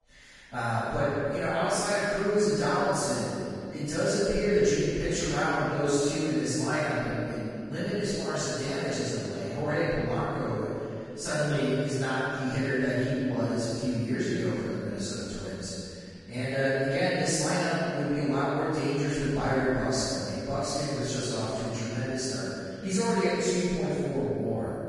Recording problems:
room echo; strong; dies away in 2.3 s
off-mic speech; far
garbled, watery; badly; nothing above 10 kHz

